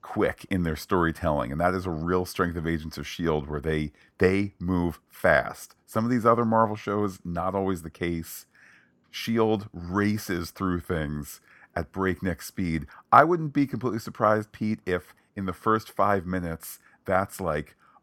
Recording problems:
none

